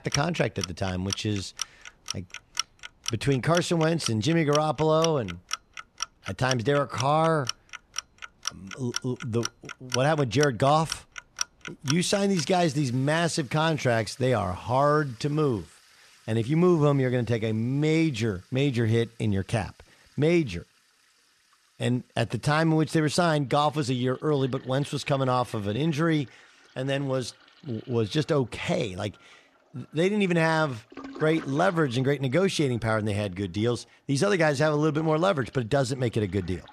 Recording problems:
household noises; noticeable; throughout; 10 dB below the speech

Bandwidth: 13.5 kHz